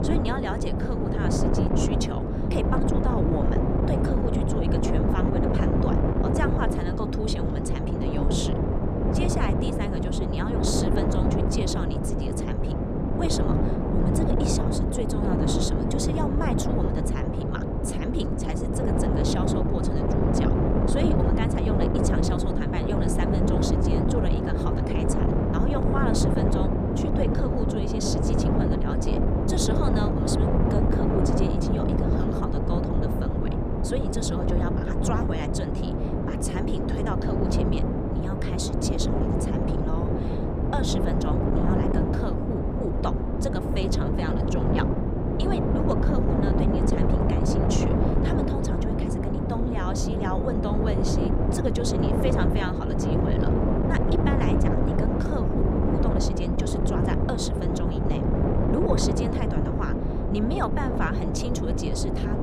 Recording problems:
wind noise on the microphone; heavy; 4 dB above the speech

